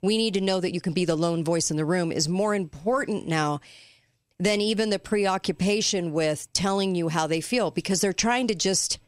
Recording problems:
none

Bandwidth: 15.5 kHz